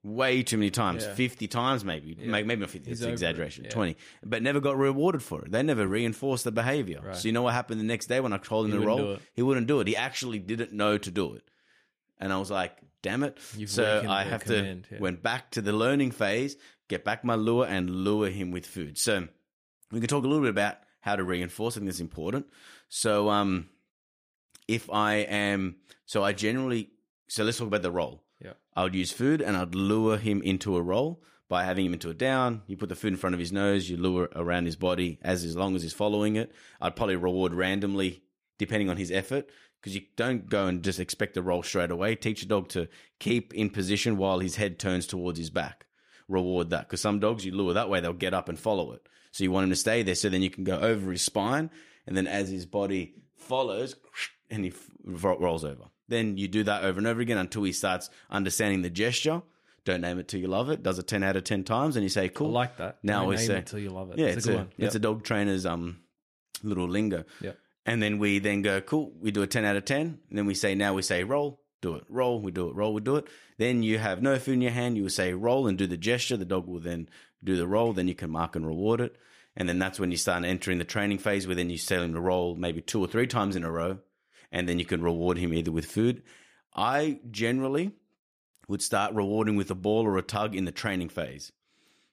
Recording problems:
none

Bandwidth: 15 kHz